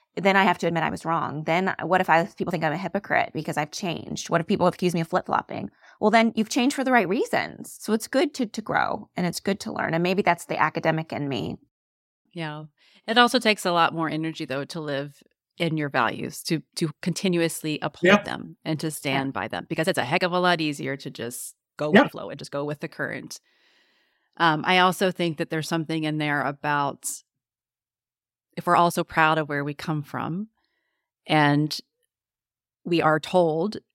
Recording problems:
uneven, jittery; strongly; from 0.5 to 33 s

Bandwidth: 16 kHz